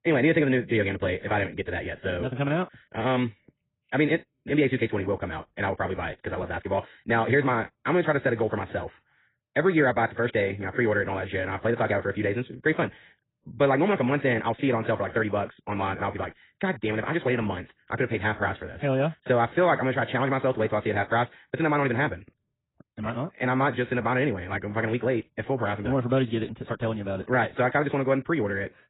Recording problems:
garbled, watery; badly; nothing above 4 kHz
wrong speed, natural pitch; too fast; 1.8 times normal speed

